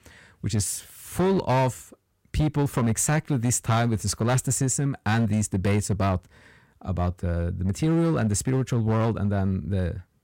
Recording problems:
distortion; slight; 9% of the sound clipped

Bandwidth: 16 kHz